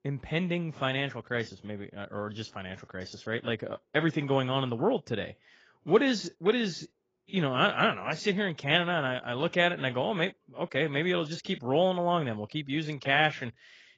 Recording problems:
garbled, watery; badly; nothing above 7.5 kHz

